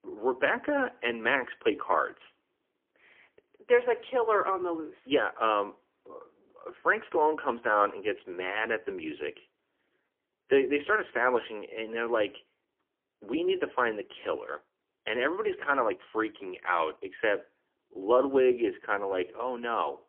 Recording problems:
phone-call audio; poor line; nothing above 3 kHz

